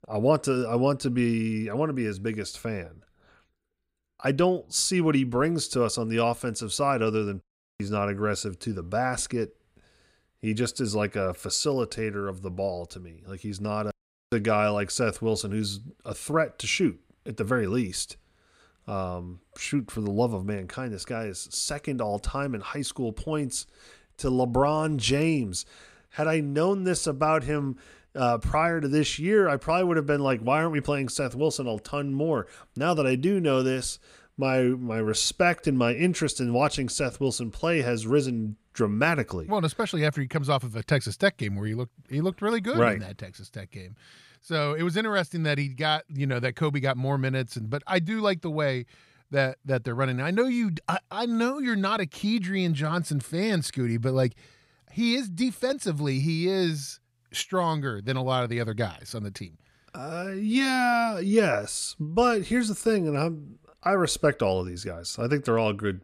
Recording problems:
none

